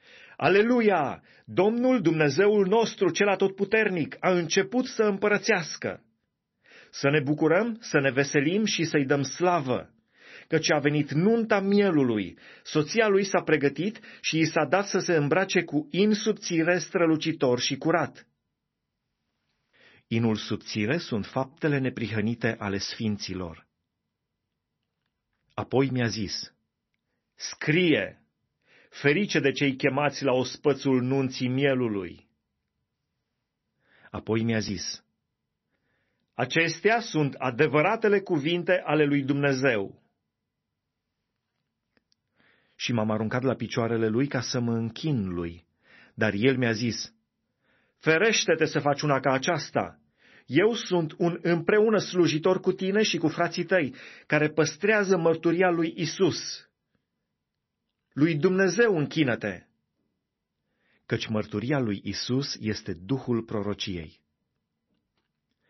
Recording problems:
garbled, watery; slightly; nothing above 6 kHz

